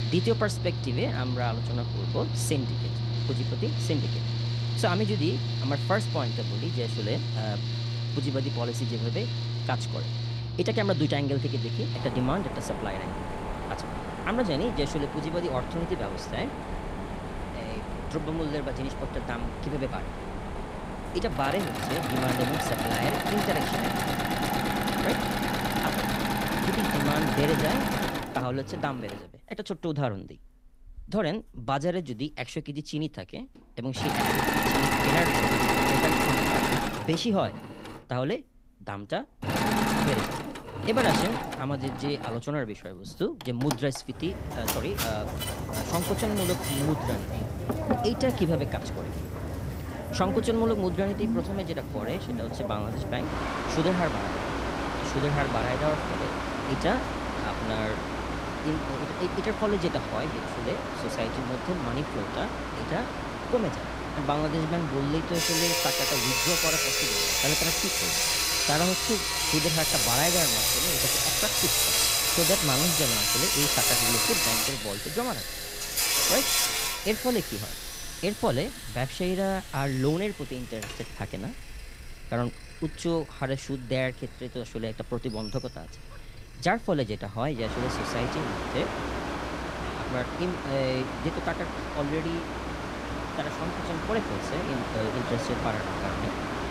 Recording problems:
machinery noise; very loud; throughout; 3 dB above the speech

